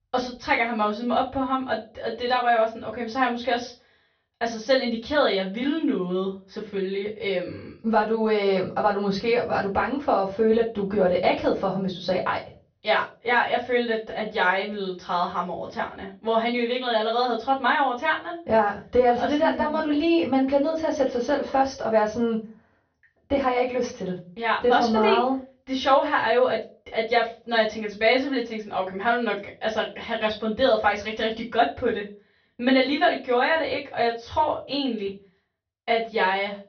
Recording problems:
off-mic speech; far
high frequencies cut off; noticeable; nothing above 6 kHz
room echo; very slight; dies away in 0.3 s

